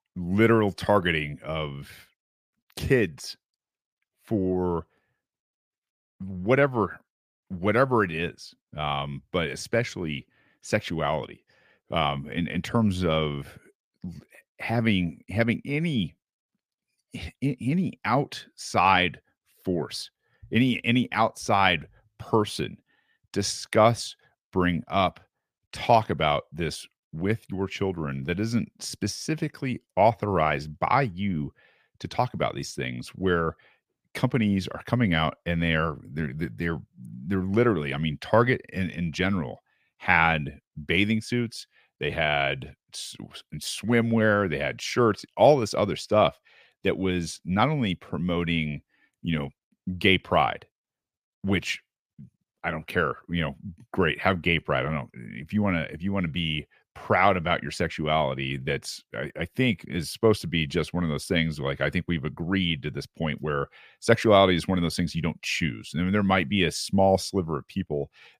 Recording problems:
none

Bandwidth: 15 kHz